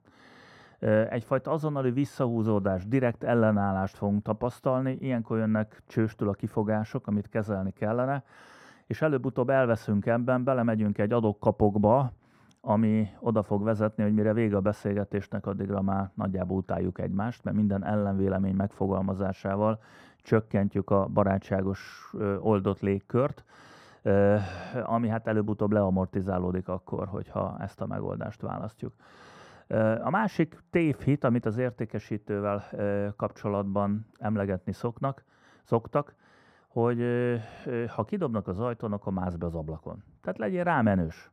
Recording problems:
muffled; very; fading above 2 kHz

